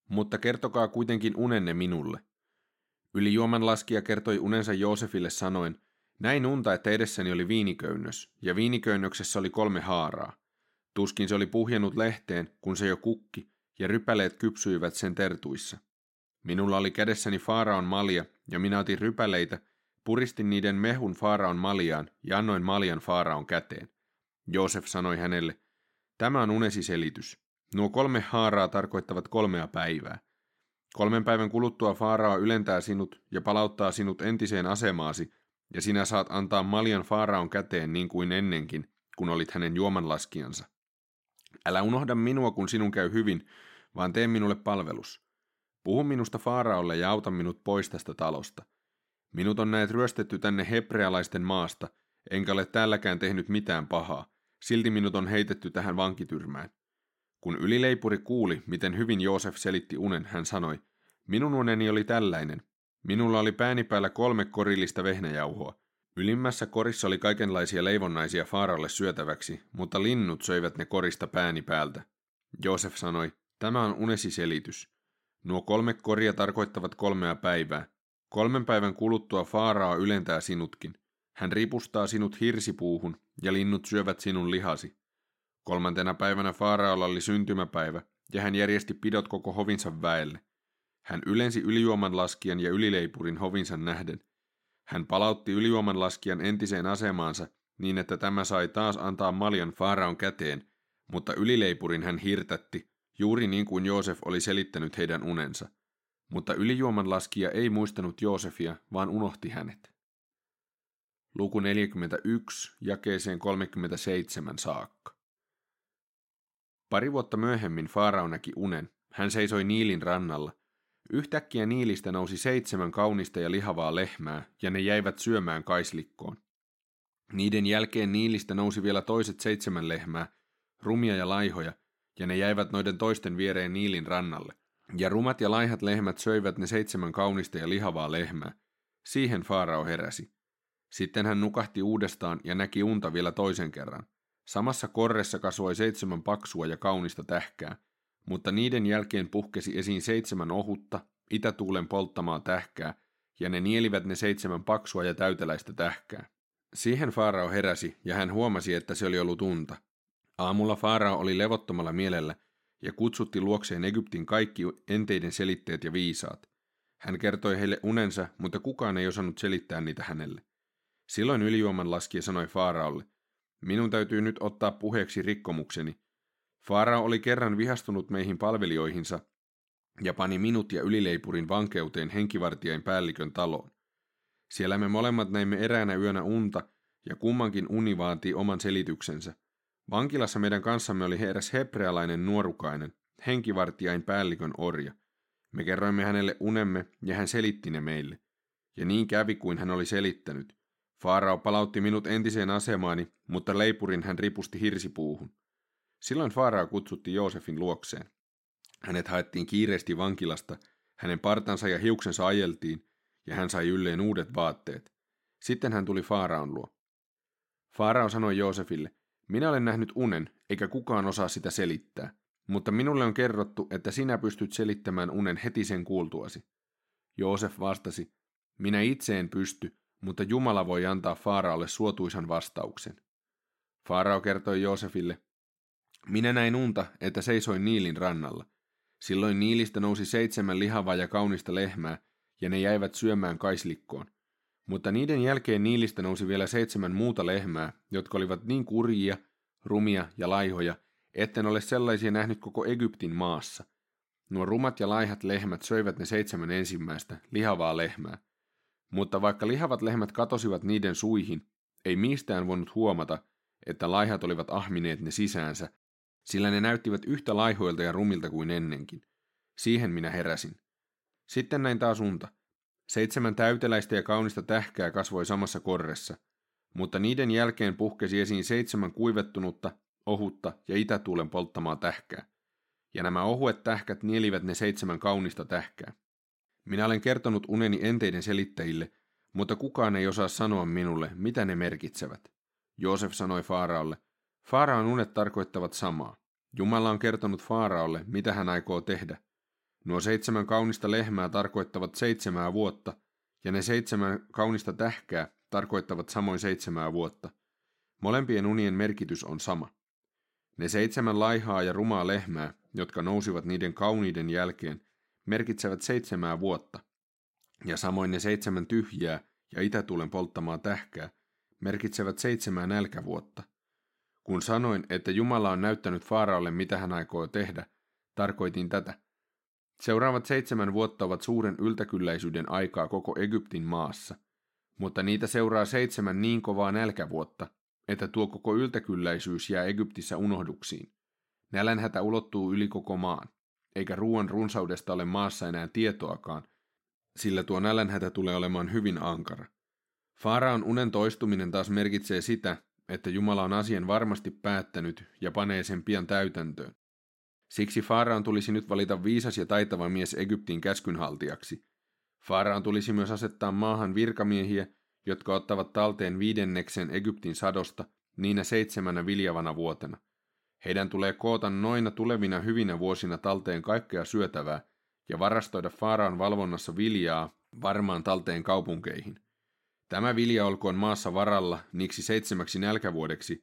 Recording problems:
none

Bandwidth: 16 kHz